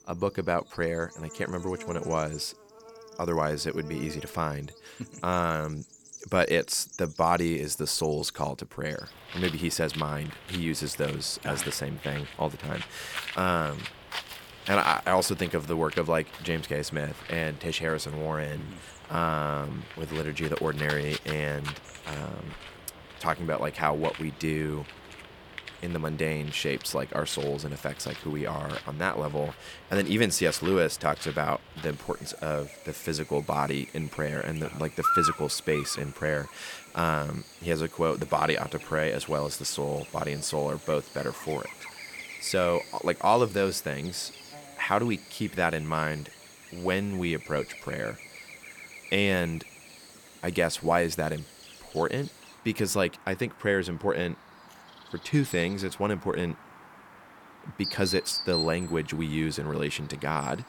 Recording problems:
animal sounds; noticeable; throughout; 10 dB below the speech

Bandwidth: 18 kHz